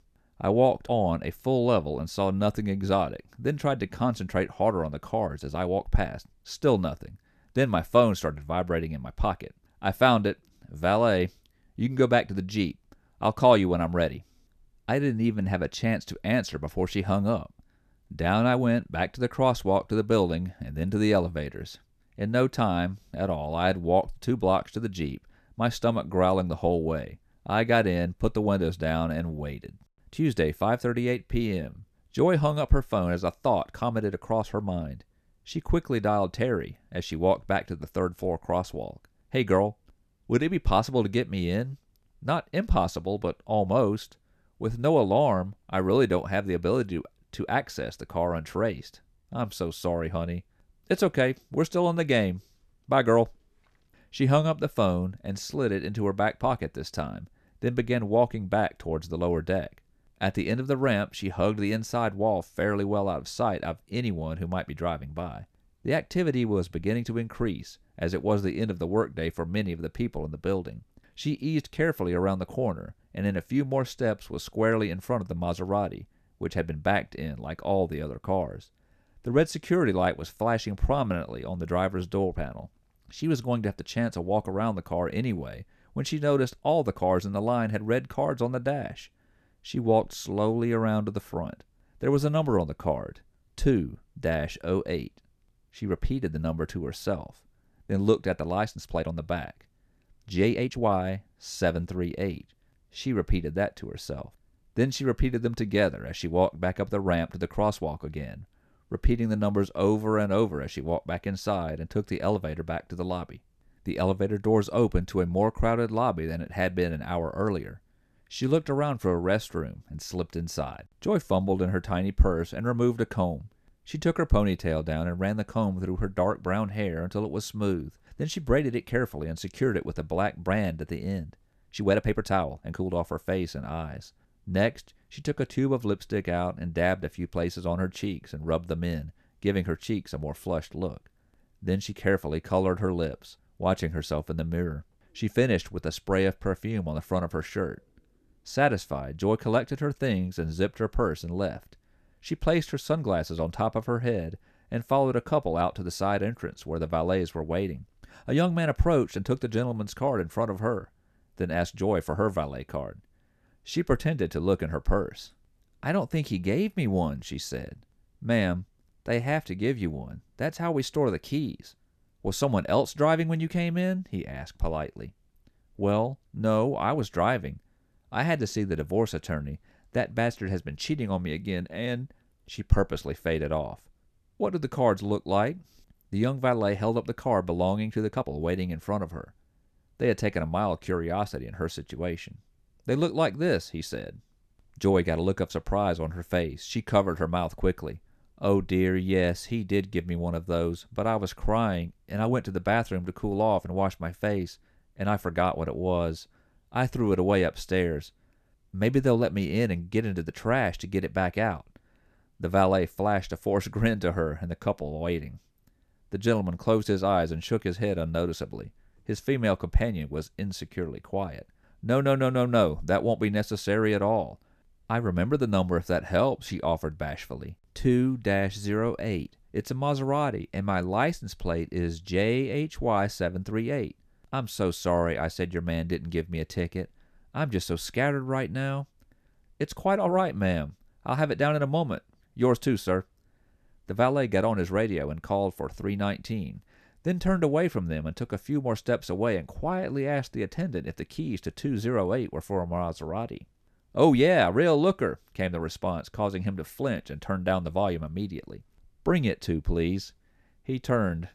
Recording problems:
uneven, jittery; strongly; from 5 s to 3:08

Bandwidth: 14 kHz